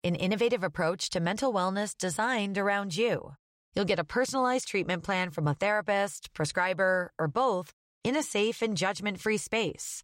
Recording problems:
none

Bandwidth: 16 kHz